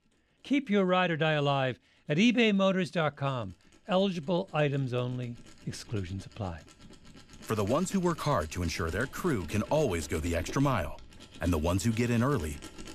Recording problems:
machinery noise; noticeable; throughout; 20 dB below the speech

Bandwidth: 14.5 kHz